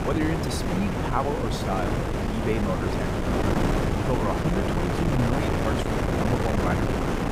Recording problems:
wind noise on the microphone; heavy; 3 dB above the speech

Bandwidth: 15.5 kHz